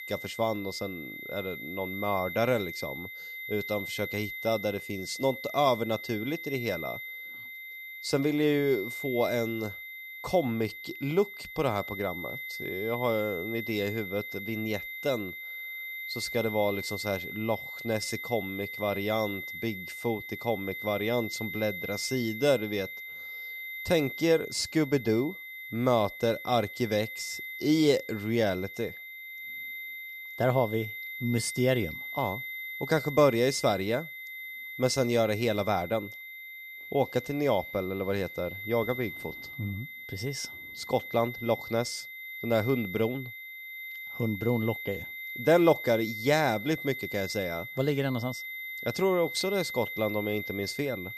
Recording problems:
high-pitched whine; loud; throughout; 2 kHz, 8 dB below the speech

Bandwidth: 15 kHz